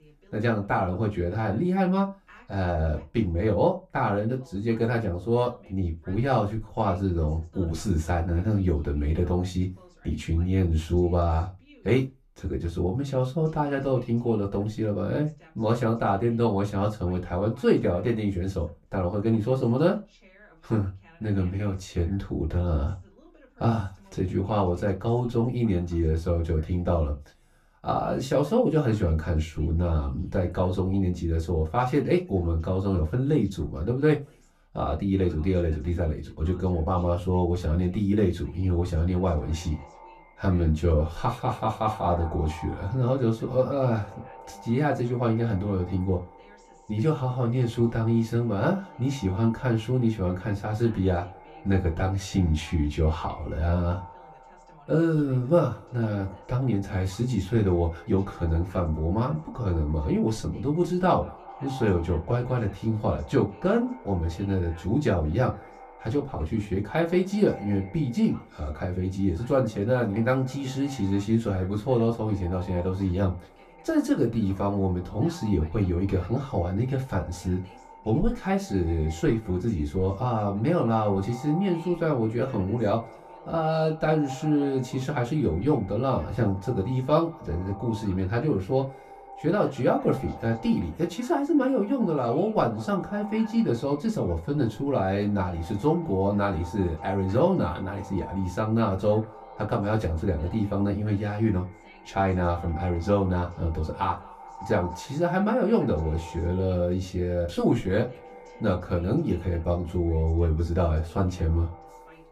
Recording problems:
off-mic speech; far
echo of what is said; faint; from 39 s on; 190 ms later, 20 dB below the speech
room echo; very slight; dies away in 0.2 s
voice in the background; faint; throughout; 30 dB below the speech

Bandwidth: 14.5 kHz